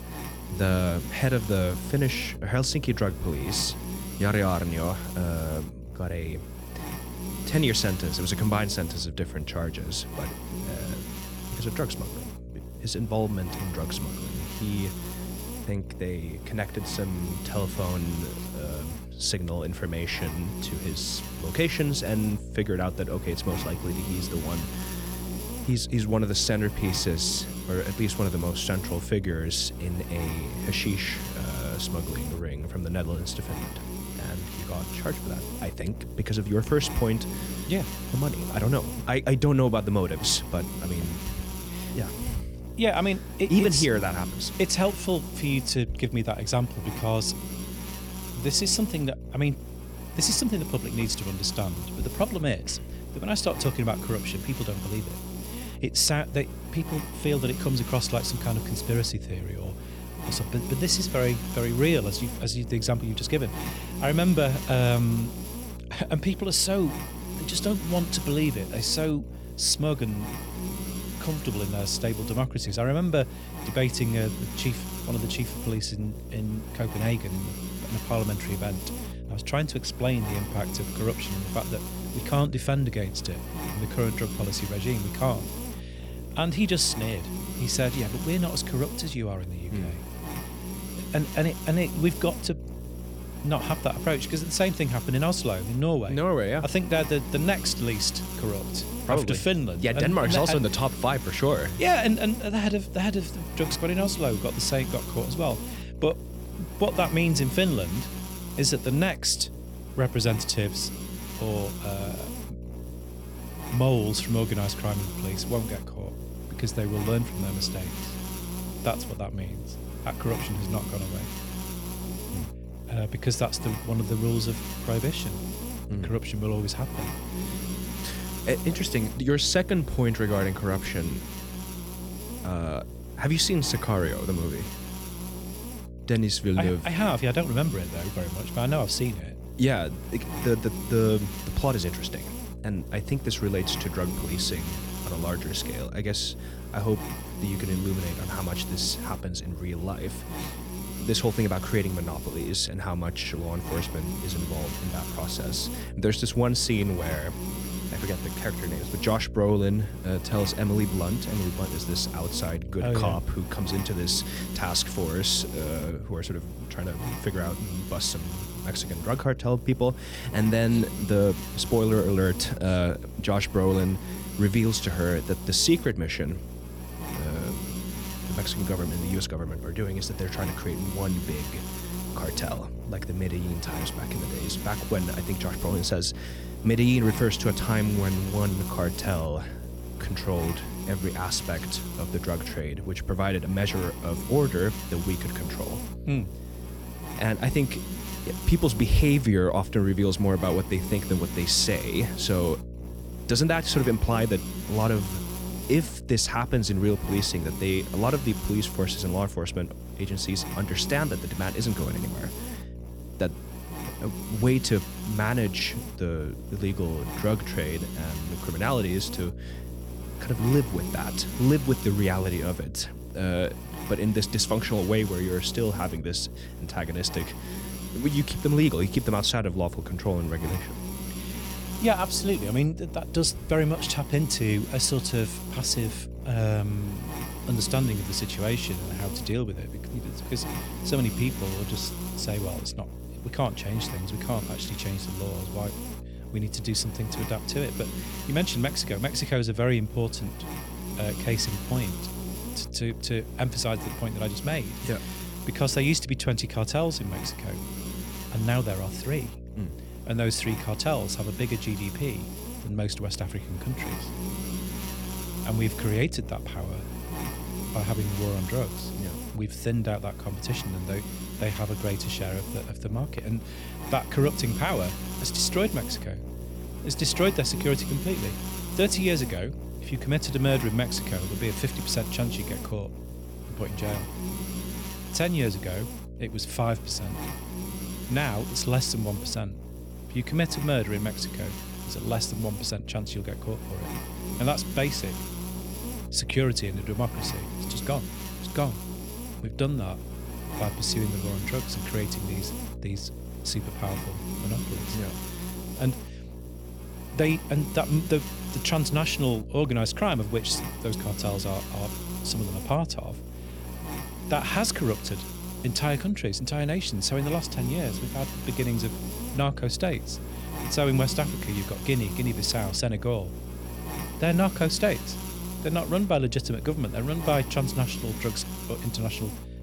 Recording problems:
electrical hum; noticeable; throughout; 60 Hz, 10 dB below the speech

